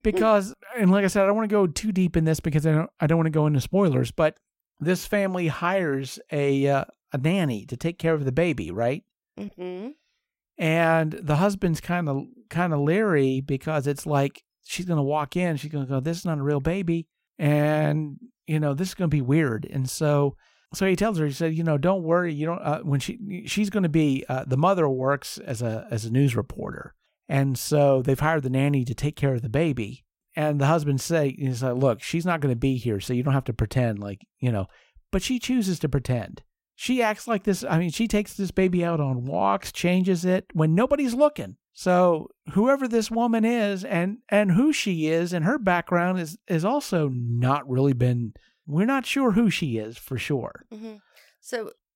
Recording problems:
none

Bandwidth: 16 kHz